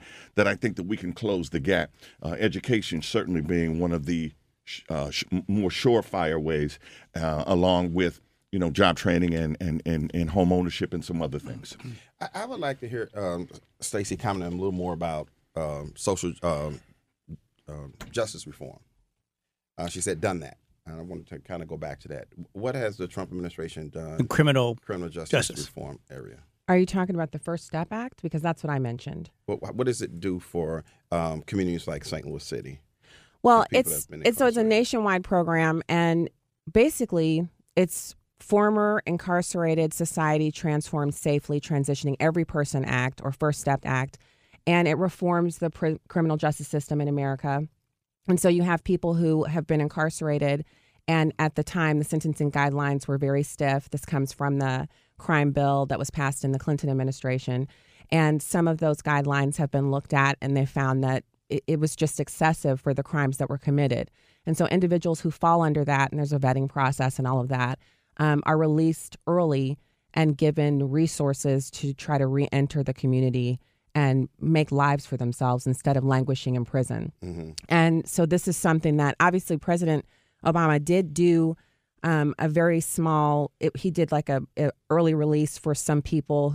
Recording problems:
abrupt cut into speech; at the end

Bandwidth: 15 kHz